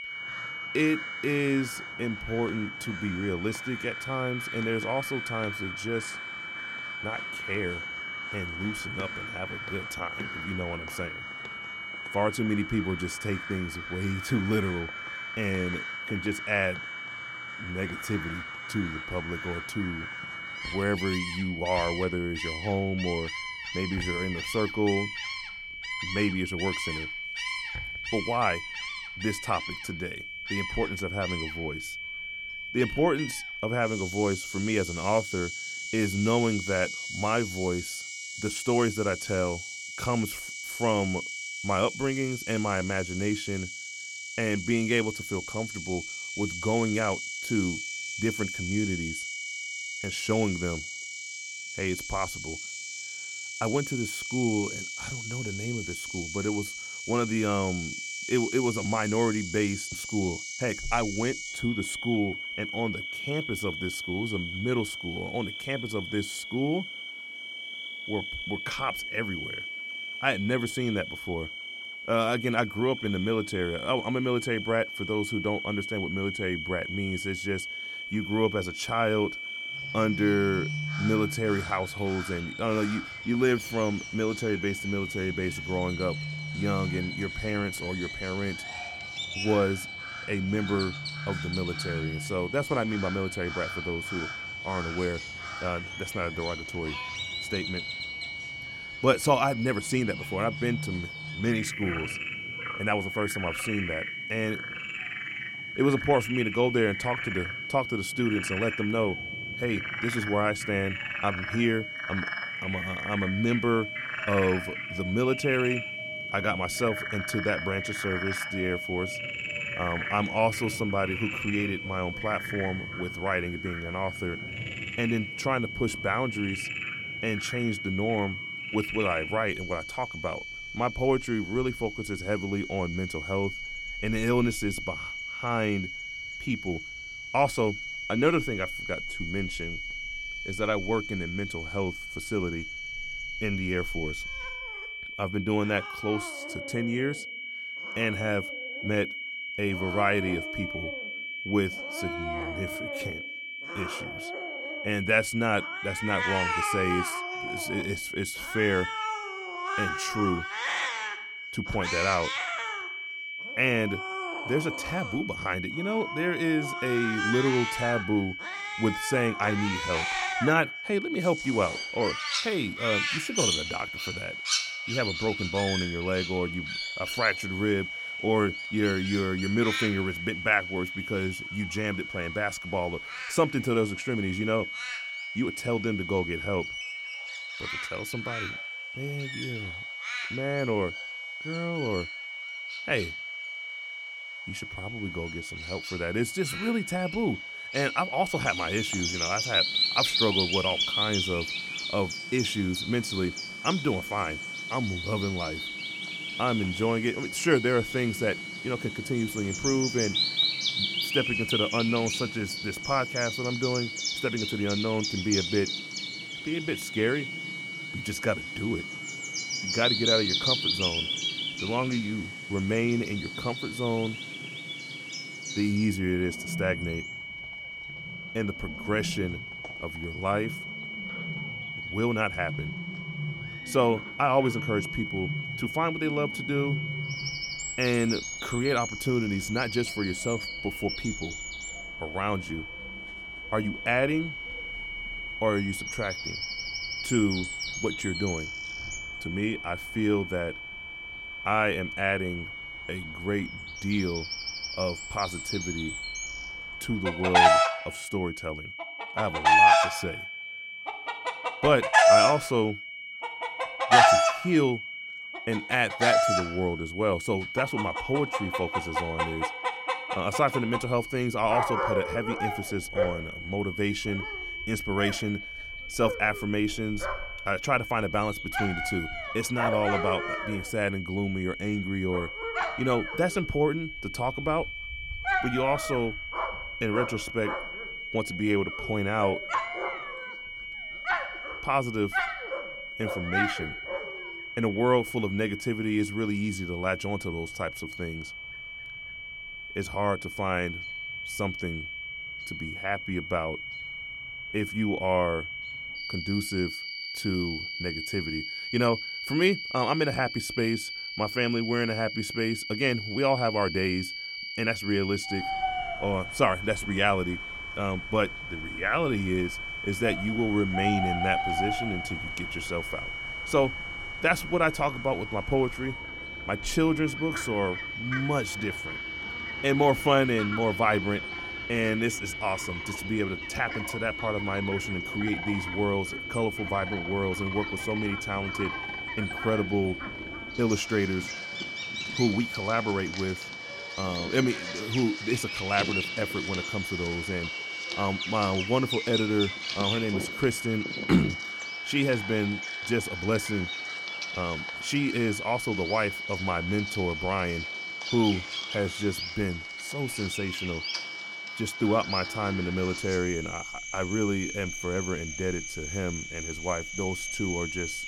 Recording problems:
high-pitched whine; loud; throughout; 2.5 kHz, 6 dB below the speech
animal sounds; loud; throughout; 4 dB below the speech

